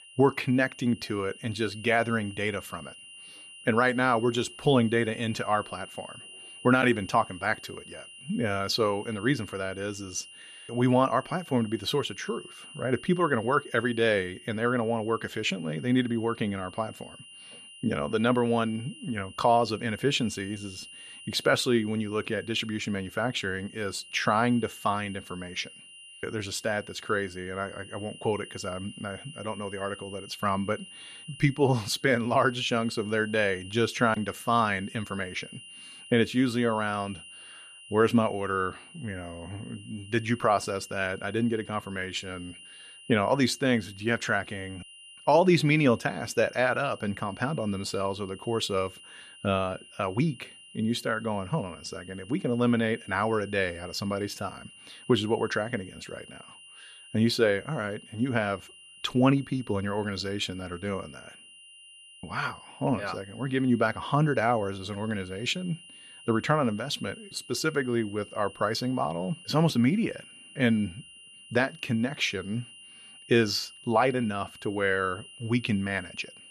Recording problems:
high-pitched whine; noticeable; throughout; 3 kHz, 20 dB below the speech

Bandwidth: 14.5 kHz